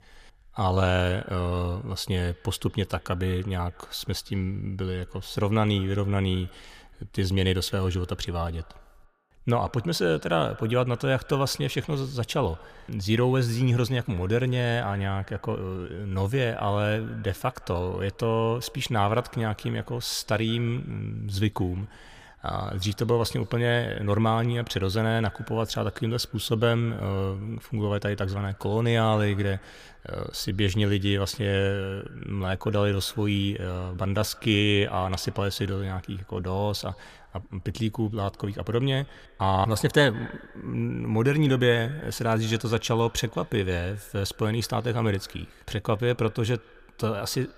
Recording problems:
echo of what is said; faint; throughout; 170 ms later, 25 dB below the speech

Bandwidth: 15 kHz